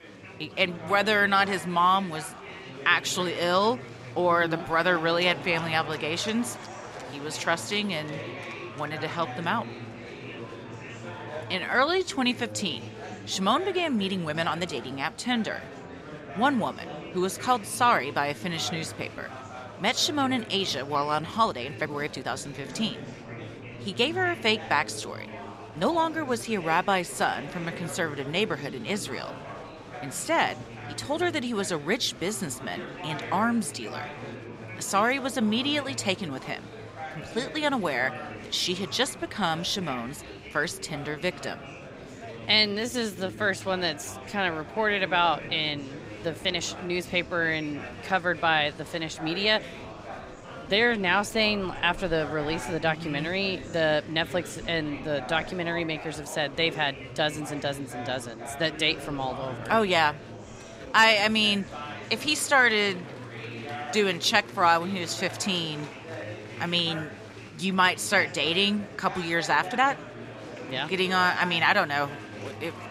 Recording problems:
murmuring crowd; noticeable; throughout; 15 dB below the speech
uneven, jittery; strongly; from 4 s to 1:10

